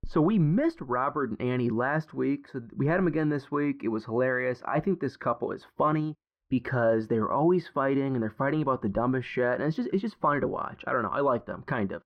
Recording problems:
muffled; very; fading above 3.5 kHz

